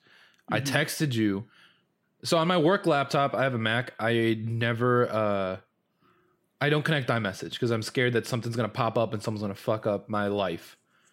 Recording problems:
none

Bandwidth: 16 kHz